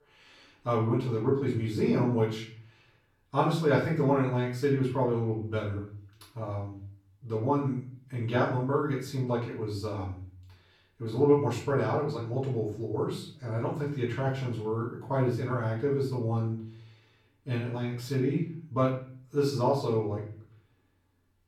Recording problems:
off-mic speech; far
room echo; noticeable; dies away in 0.5 s

